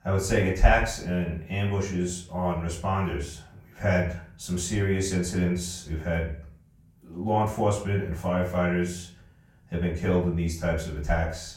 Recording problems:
off-mic speech; far
room echo; slight; dies away in 0.4 s

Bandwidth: 16 kHz